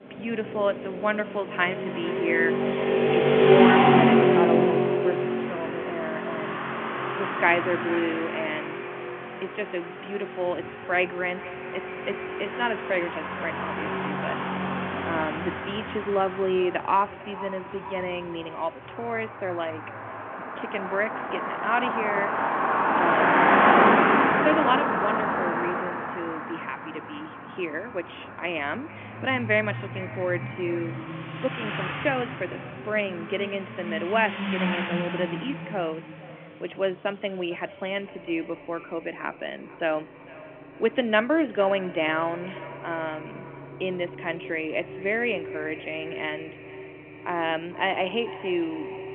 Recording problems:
echo of what is said; noticeable; throughout; 450 ms later, 15 dB below the speech
phone-call audio
traffic noise; very loud; throughout; 4 dB above the speech

